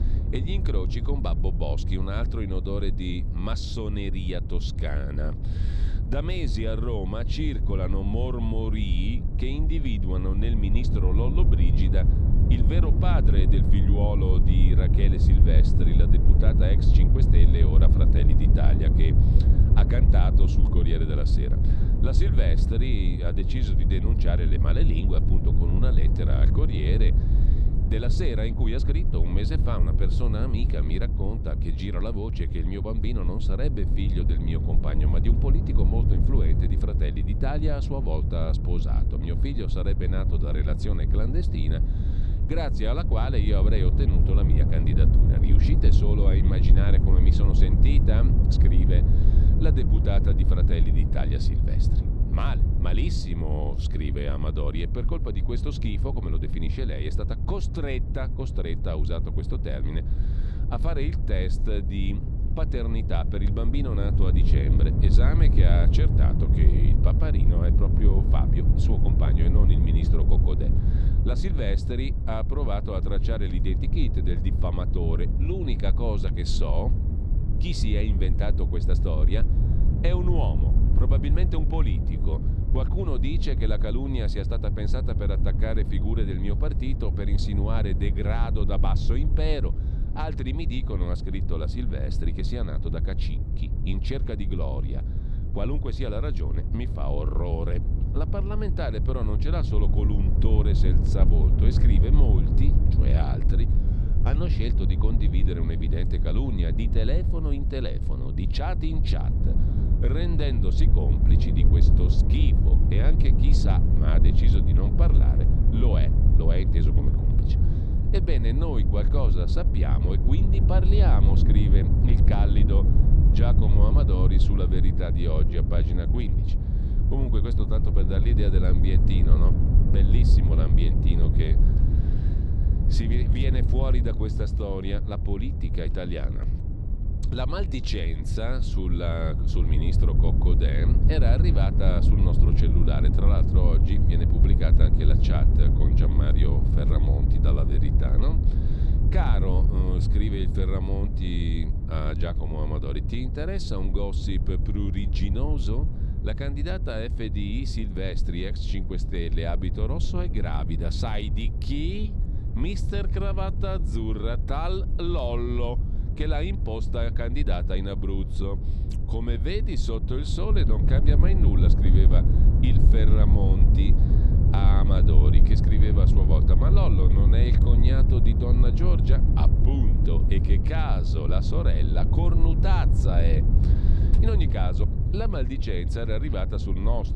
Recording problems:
wind noise on the microphone; heavy; 3 dB below the speech

